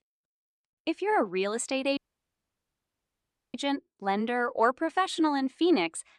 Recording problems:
audio cutting out; at 2 s for 1.5 s

